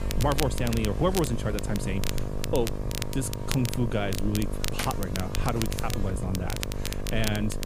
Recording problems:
electrical hum; loud; throughout; 50 Hz, 6 dB below the speech
crackle, like an old record; loud; 7 dB below the speech

